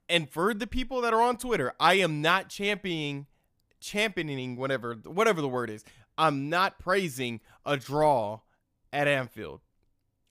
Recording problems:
none

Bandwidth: 15 kHz